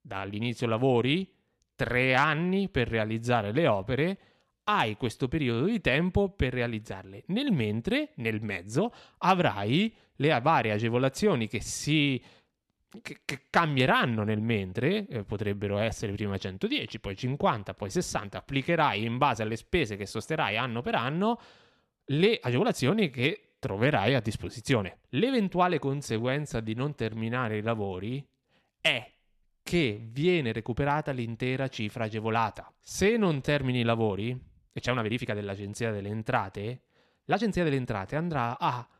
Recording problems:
uneven, jittery; strongly; from 1.5 to 38 s

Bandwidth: 13.5 kHz